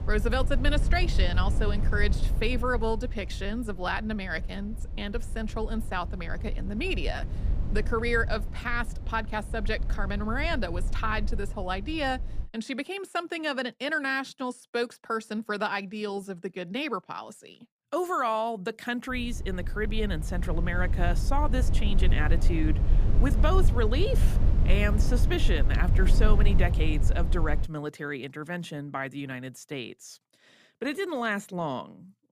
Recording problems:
low rumble; noticeable; until 12 s and from 19 to 28 s; 15 dB below the speech

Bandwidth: 15 kHz